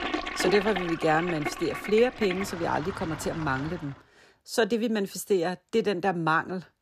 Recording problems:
household noises; loud; until 4 s; 6 dB below the speech

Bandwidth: 14.5 kHz